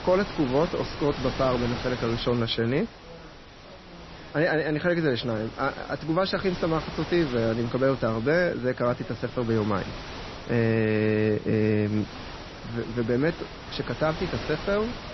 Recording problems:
garbled, watery; slightly; nothing above 5.5 kHz
wind noise on the microphone; occasional gusts; 10 dB below the speech
background chatter; faint; throughout; 3 voices, 25 dB below the speech

